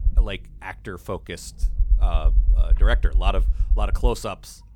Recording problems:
low rumble; noticeable; throughout; 15 dB below the speech

